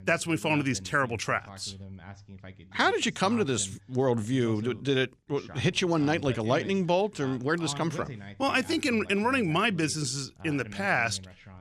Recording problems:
voice in the background; noticeable; throughout; 15 dB below the speech

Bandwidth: 15 kHz